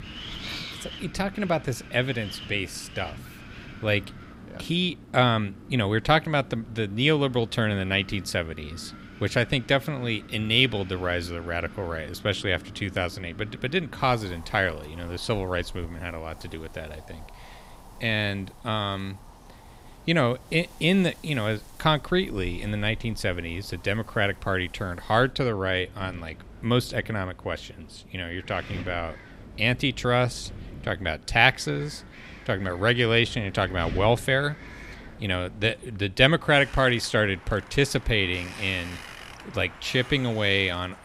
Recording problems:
wind in the background; noticeable; throughout; 20 dB below the speech

